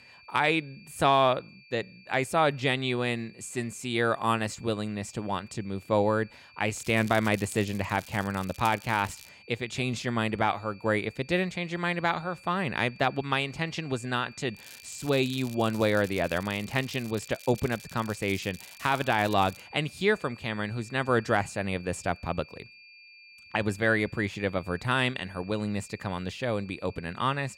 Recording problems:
crackling; noticeable; from 6.5 to 9.5 s and from 15 to 20 s; 20 dB below the speech
high-pitched whine; faint; throughout; 2.5 kHz, 20 dB below the speech

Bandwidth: 16 kHz